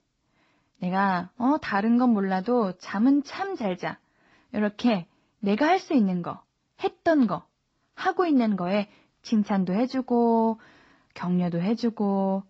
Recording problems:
garbled, watery; slightly; nothing above 8 kHz

